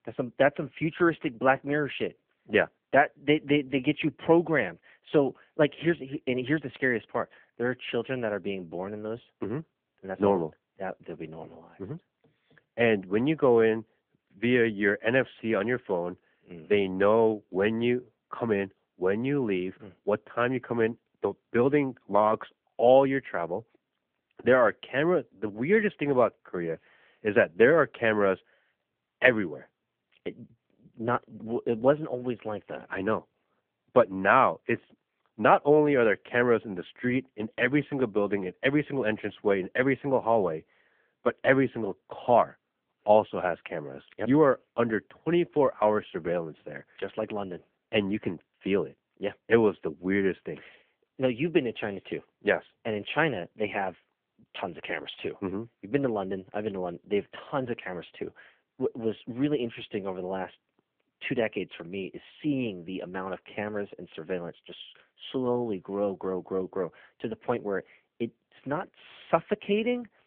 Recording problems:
phone-call audio

